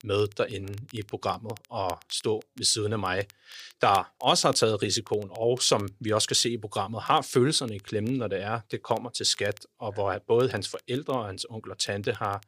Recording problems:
crackle, like an old record; faint; 25 dB below the speech

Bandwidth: 15 kHz